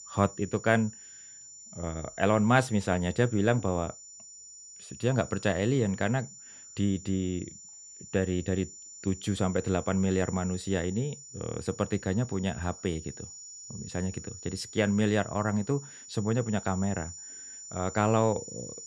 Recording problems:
high-pitched whine; noticeable; throughout; 7 kHz, 15 dB below the speech

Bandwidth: 13.5 kHz